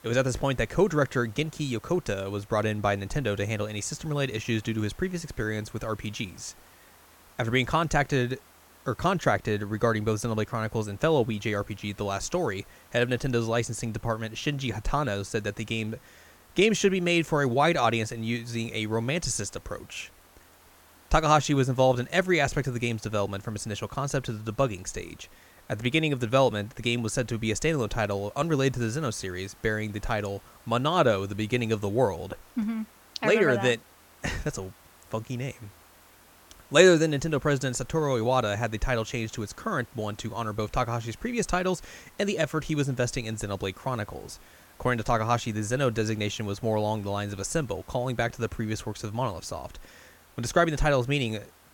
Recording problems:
hiss; faint; throughout; 25 dB below the speech

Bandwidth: 17 kHz